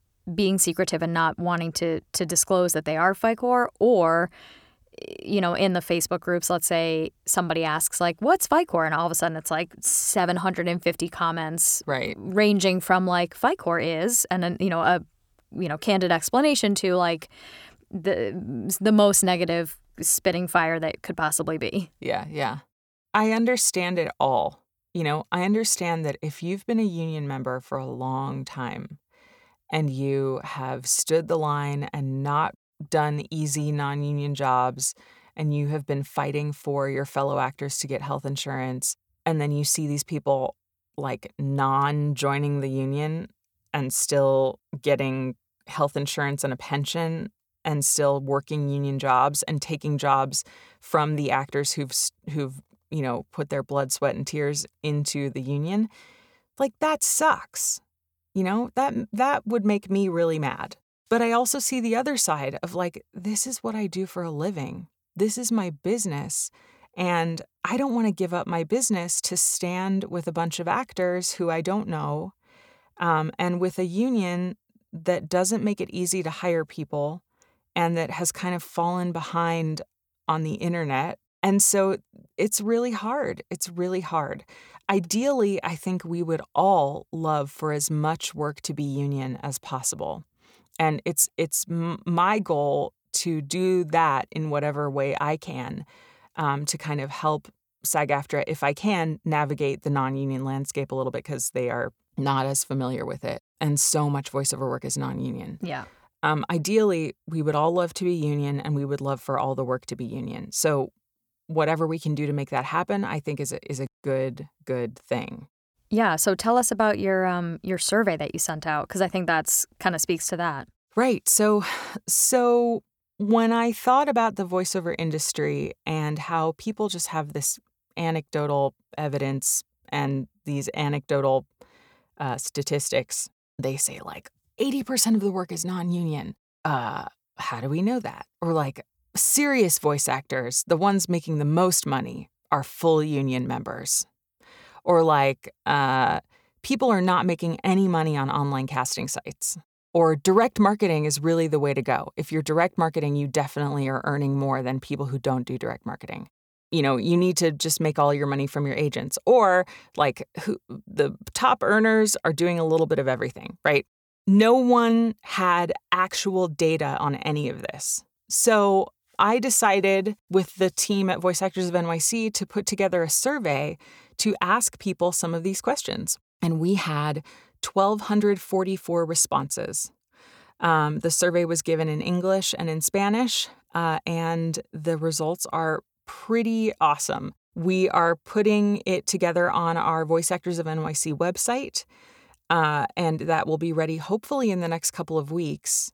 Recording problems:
none

